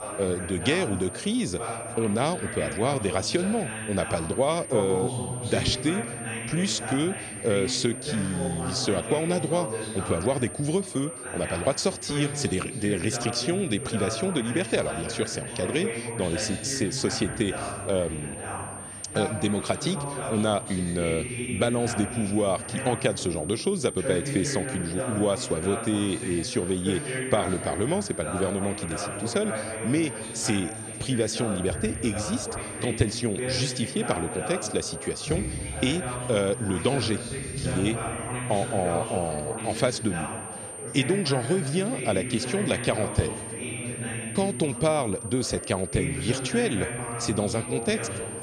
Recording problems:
high-pitched whine; loud; throughout; 9 kHz, 9 dB below the speech
background chatter; loud; throughout; 4 voices, 6 dB below the speech

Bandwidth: 14 kHz